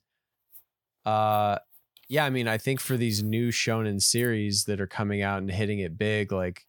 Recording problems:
none

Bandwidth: 18 kHz